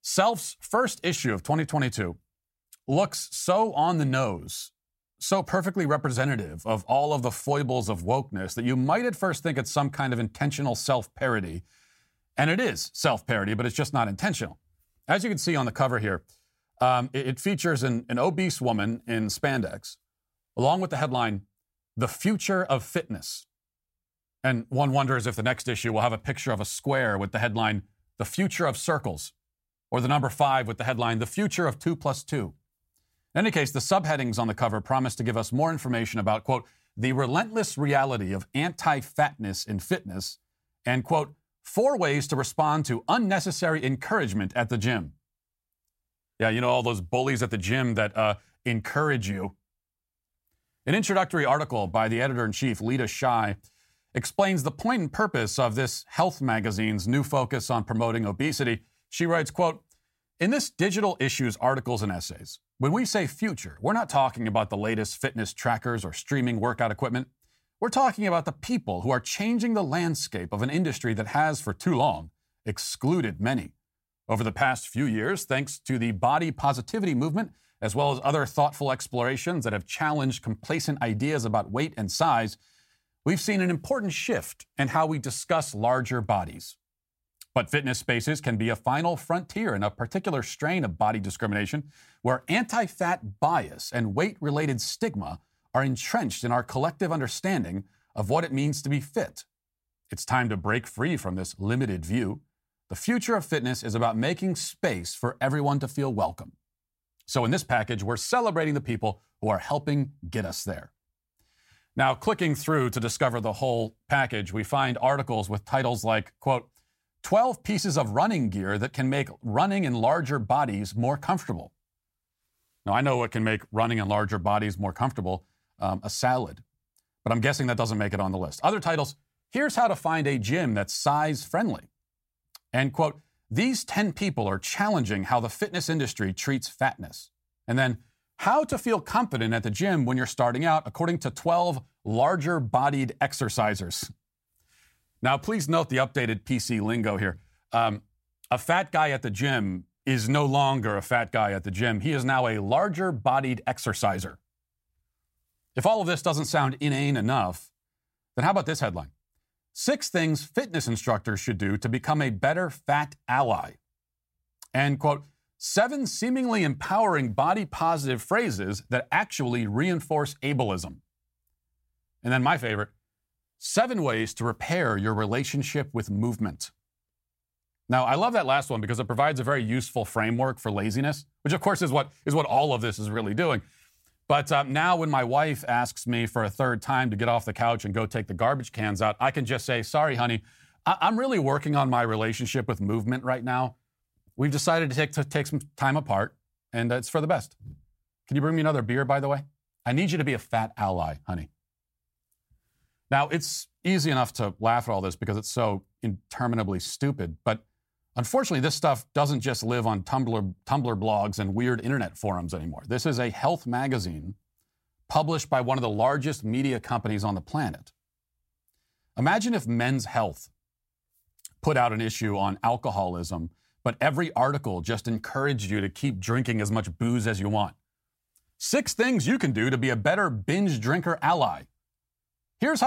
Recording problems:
abrupt cut into speech; at the end

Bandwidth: 16 kHz